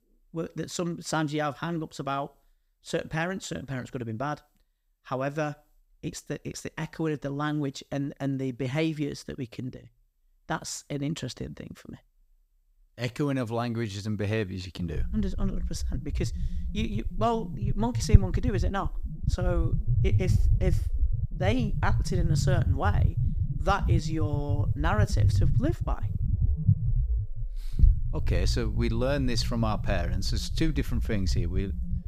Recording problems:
low rumble; noticeable; from 15 s on; 10 dB below the speech

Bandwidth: 15.5 kHz